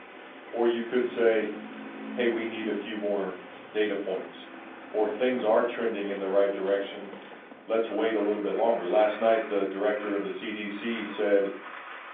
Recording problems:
off-mic speech; far
room echo; slight; dies away in 0.4 s
phone-call audio; nothing above 3.5 kHz
traffic noise; noticeable; throughout; 15 dB below the speech

